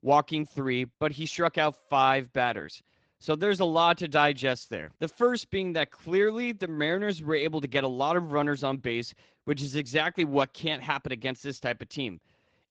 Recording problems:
garbled, watery; slightly

